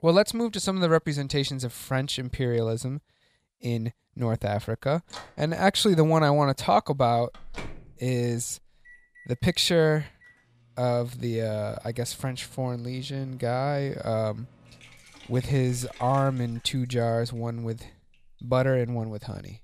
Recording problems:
household noises; faint; from 4.5 s on; 25 dB below the speech

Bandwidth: 15 kHz